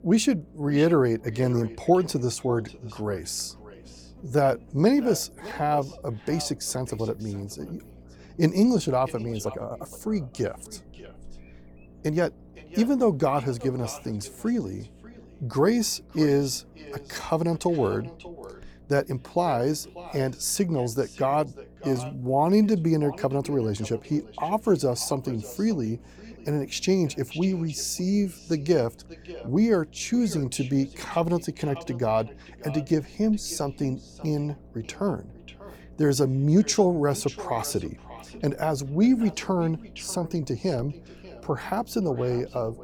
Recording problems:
echo of what is said; faint; throughout; 590 ms later, 20 dB below the speech
electrical hum; faint; throughout; 60 Hz, 30 dB below the speech
uneven, jittery; strongly; from 4 to 23 s

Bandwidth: 18 kHz